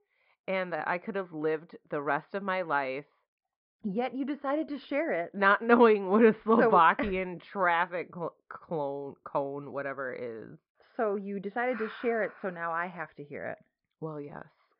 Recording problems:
high frequencies cut off; noticeable; nothing above 5.5 kHz
muffled; very slightly; fading above 1.5 kHz

